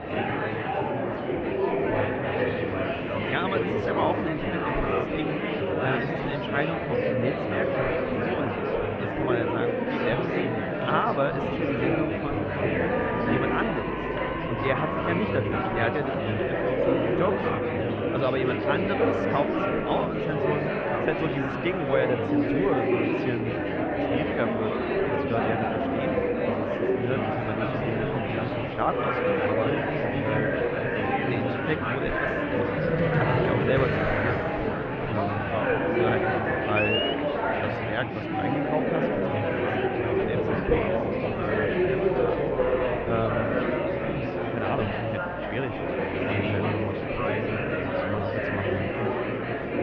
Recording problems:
muffled; very; fading above 2.5 kHz
murmuring crowd; very loud; throughout; 5 dB above the speech

